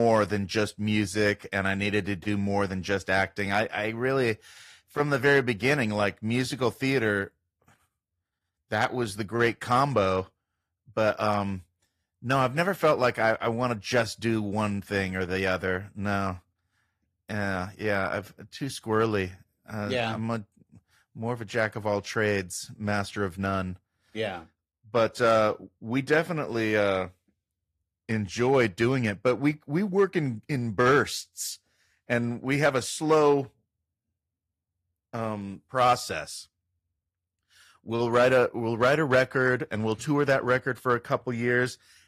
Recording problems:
garbled, watery; slightly; nothing above 14.5 kHz
abrupt cut into speech; at the start

